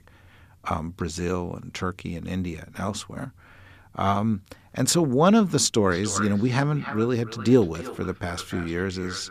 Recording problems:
echo of what is said; noticeable; from 6 s on; 300 ms later, 15 dB below the speech

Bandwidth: 14.5 kHz